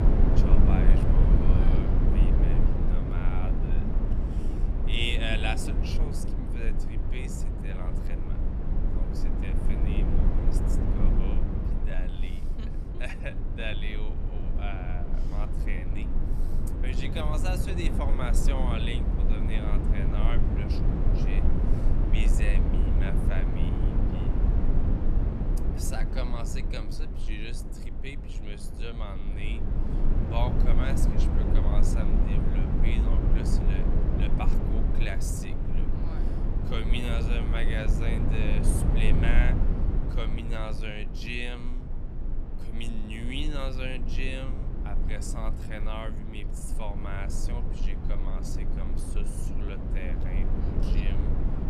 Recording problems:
wrong speed, natural pitch; too slow; 0.6 times normal speed
low rumble; loud; throughout; 1 dB below the speech

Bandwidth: 13.5 kHz